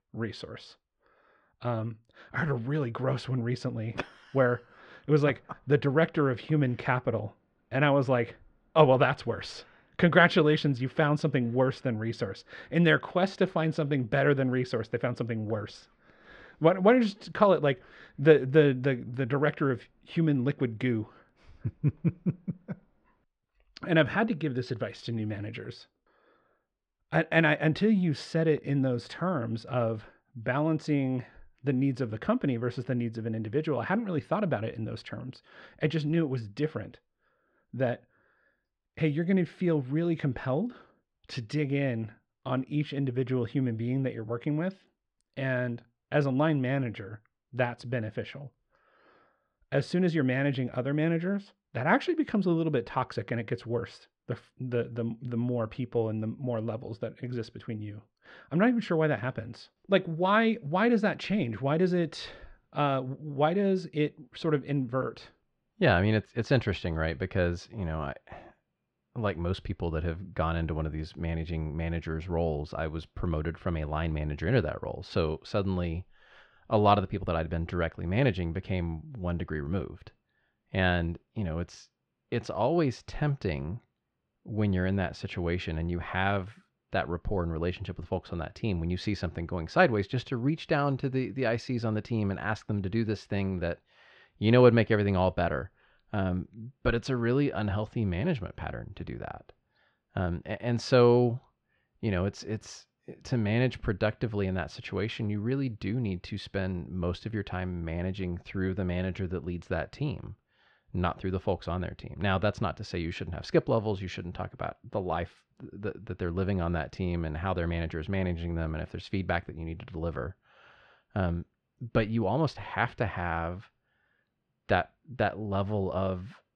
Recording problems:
muffled; very; fading above 2 kHz

